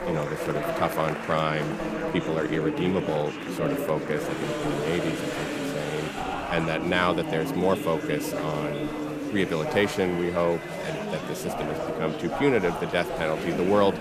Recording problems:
murmuring crowd; loud; throughout; 3 dB below the speech

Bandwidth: 15 kHz